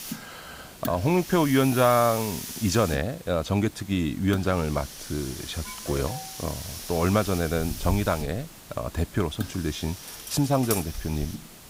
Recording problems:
hiss; noticeable; throughout; 10 dB below the speech
alarm; faint; at 5.5 s; peak 15 dB below the speech
clattering dishes; noticeable; at 10 s; peak 5 dB below the speech

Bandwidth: 15.5 kHz